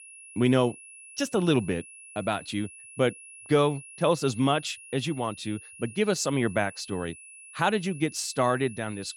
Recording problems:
high-pitched whine; noticeable; throughout; 2.5 kHz, 15 dB below the speech

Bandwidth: 17 kHz